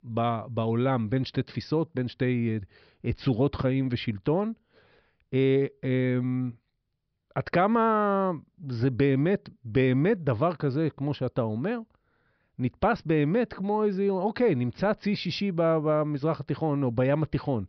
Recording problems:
high frequencies cut off; noticeable; nothing above 5.5 kHz

